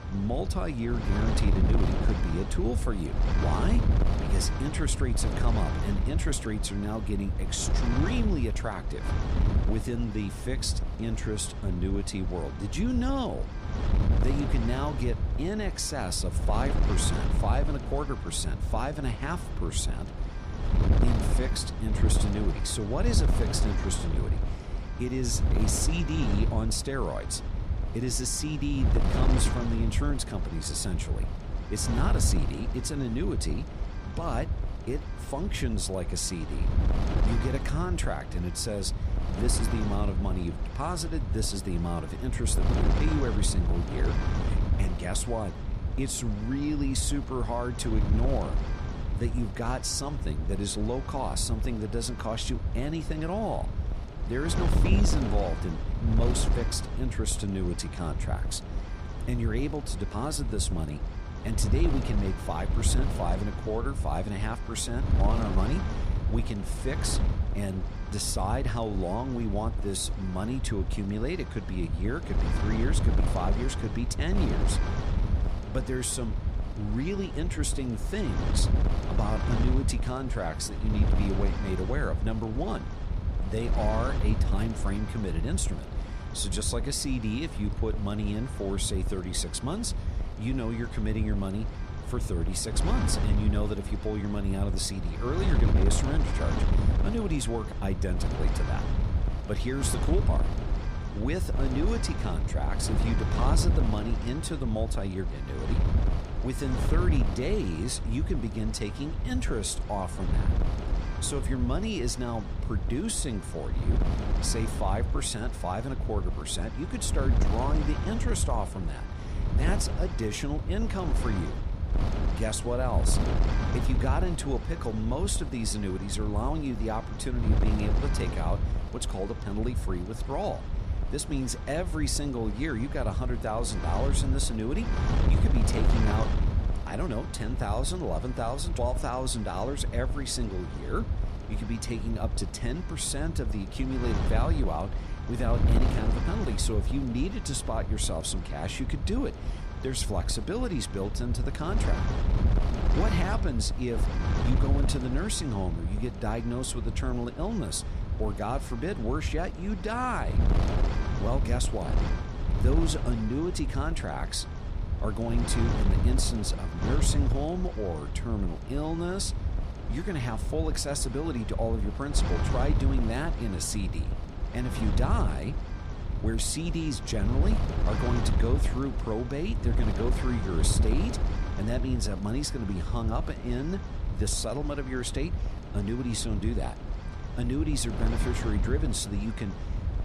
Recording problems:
wind noise on the microphone; heavy; 6 dB below the speech

